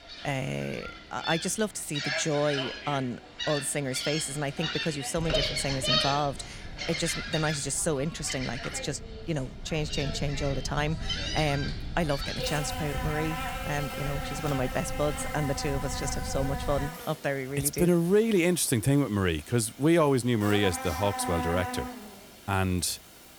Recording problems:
animal sounds; loud; throughout; 5 dB below the speech
low rumble; faint; from 5 to 17 s; 25 dB below the speech

